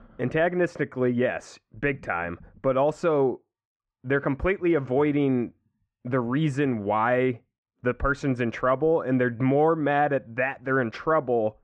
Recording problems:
muffled; very; fading above 2 kHz

